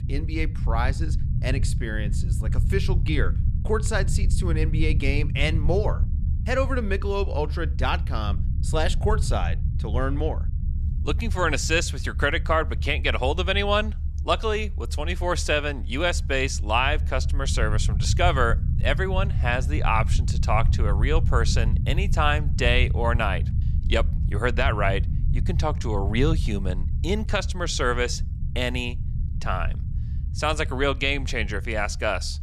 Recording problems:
low rumble; noticeable; throughout; 15 dB below the speech

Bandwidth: 13.5 kHz